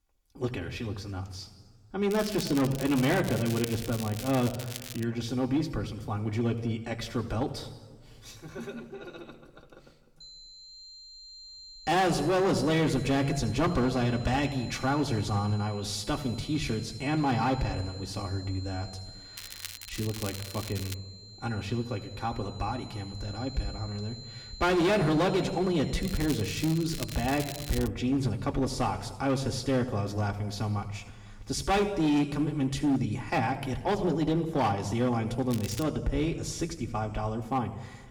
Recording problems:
room echo; slight; dies away in 1.4 s
distortion; slight; 5% of the sound clipped
off-mic speech; somewhat distant
high-pitched whine; noticeable; from 10 to 28 s; 4 kHz, 15 dB below the speech
crackling; noticeable; 4 times, first at 2 s; 10 dB below the speech

